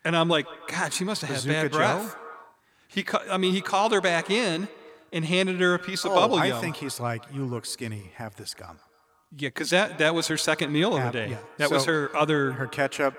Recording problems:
echo of what is said; noticeable; throughout; 150 ms later, 20 dB below the speech

